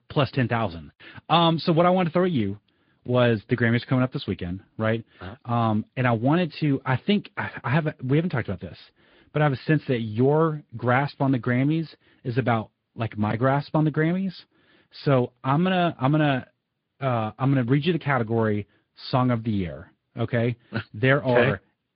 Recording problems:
high frequencies cut off; severe; nothing above 5 kHz
garbled, watery; slightly

